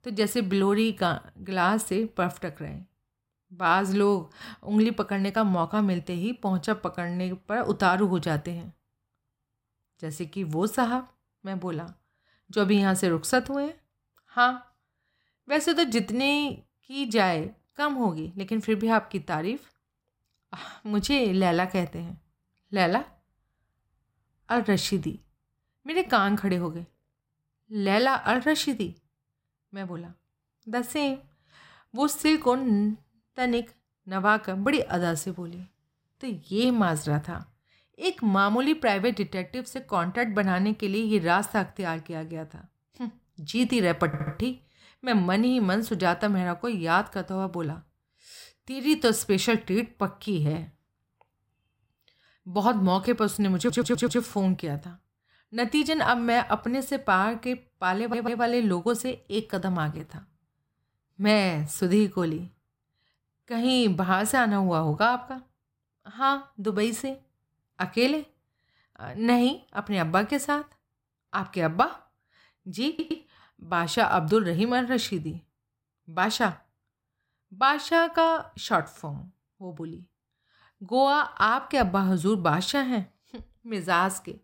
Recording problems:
audio stuttering; 4 times, first at 44 s

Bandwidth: 16 kHz